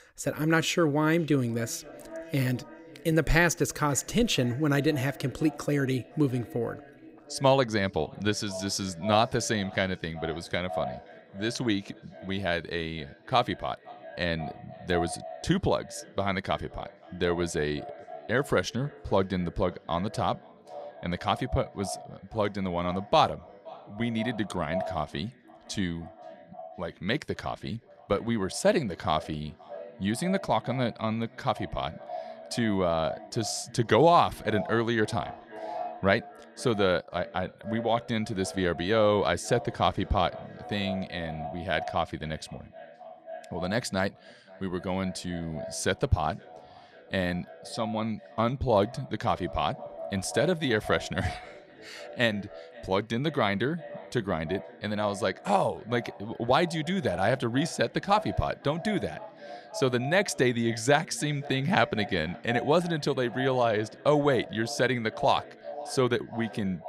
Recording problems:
echo of what is said; noticeable; throughout; 520 ms later, 15 dB below the speech

